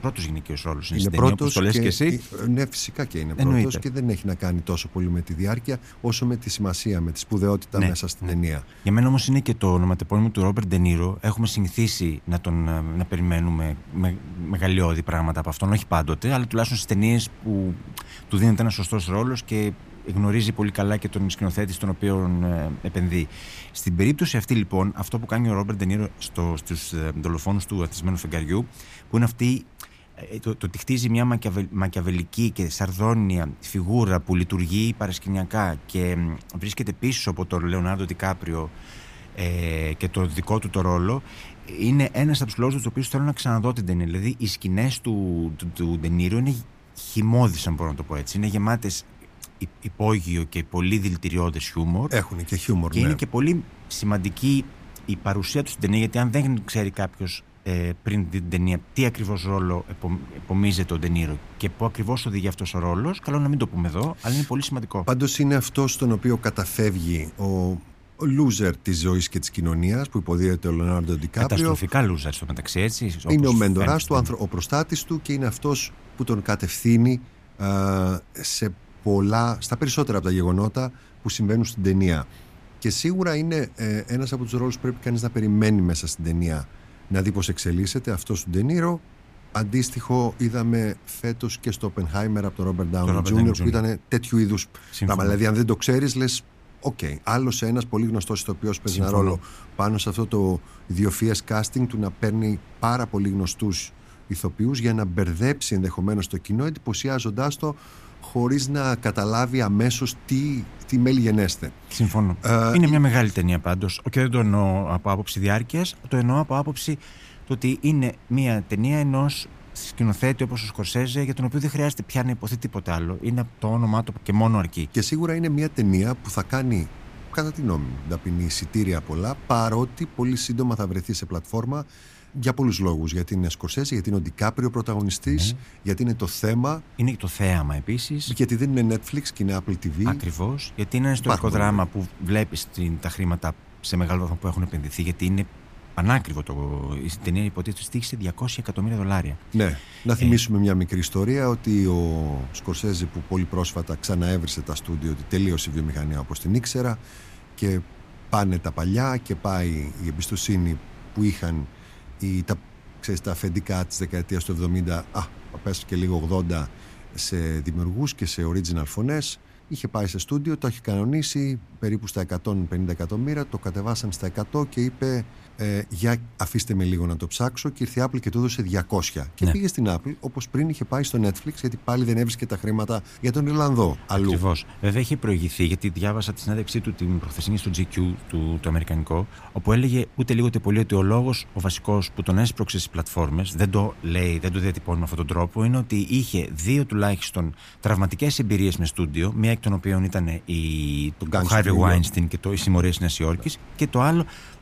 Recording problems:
wind noise on the microphone; occasional gusts; 25 dB below the speech

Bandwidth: 15 kHz